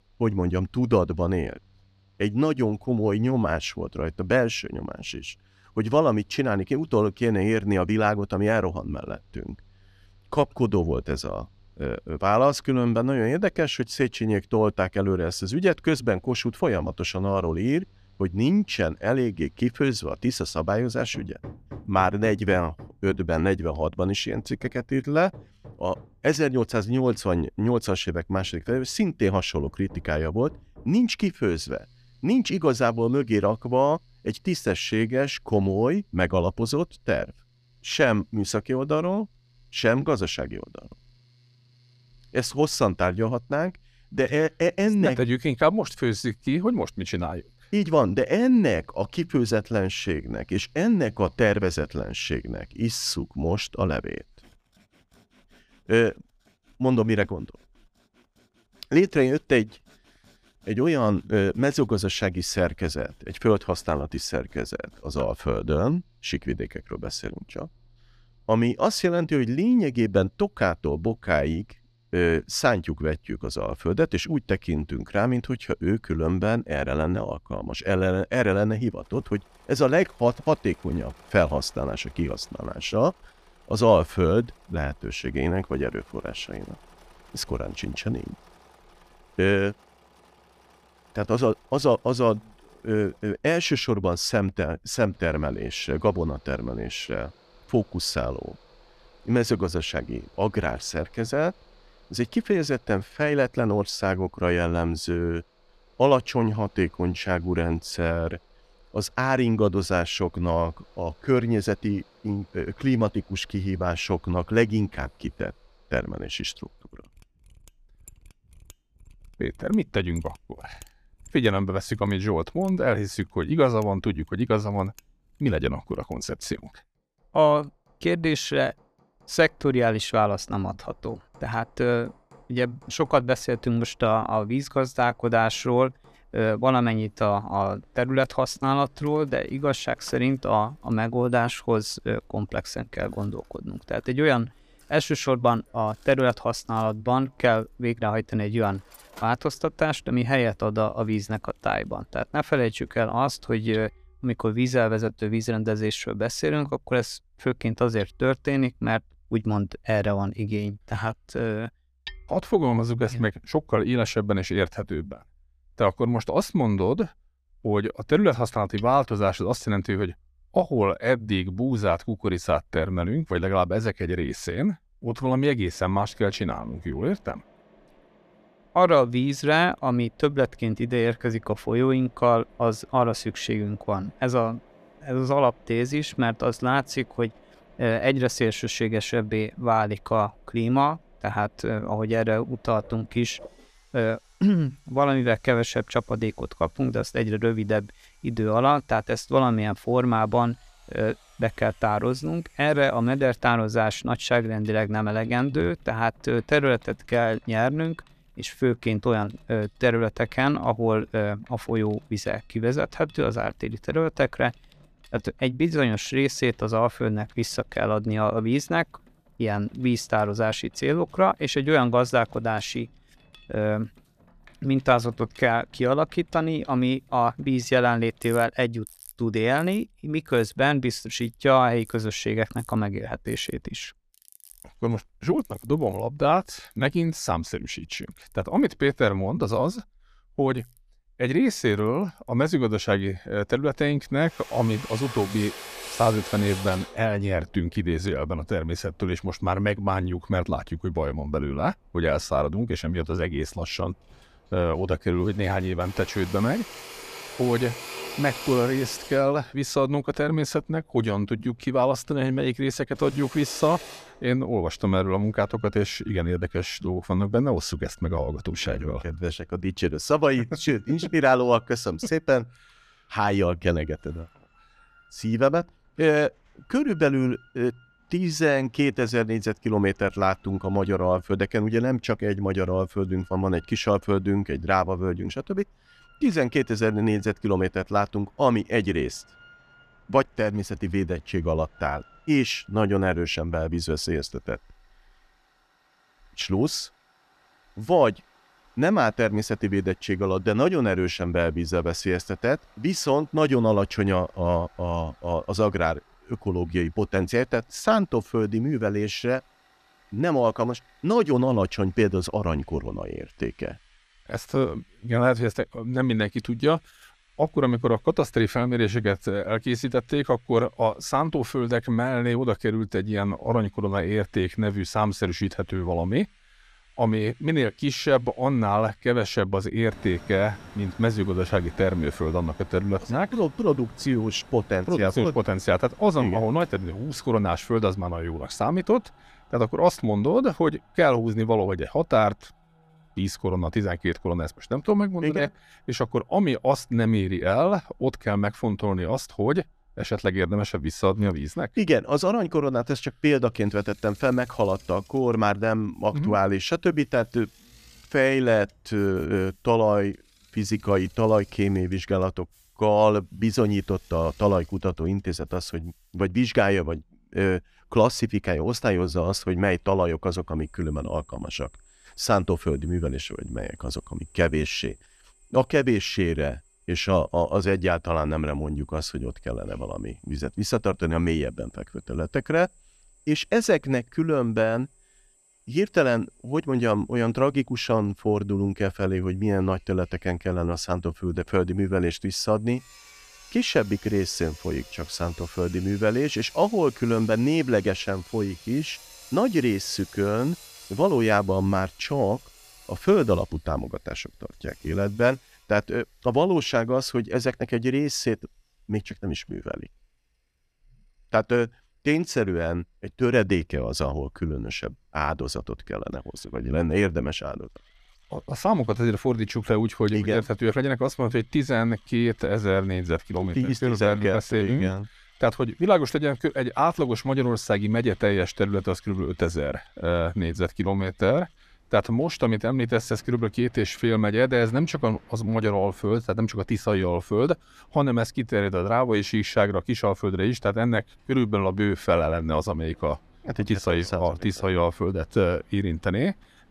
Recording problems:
machinery noise; faint; throughout; 25 dB below the speech

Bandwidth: 14.5 kHz